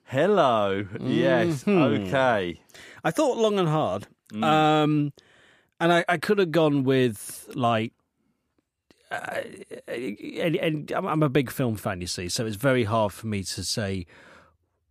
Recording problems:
none

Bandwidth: 15 kHz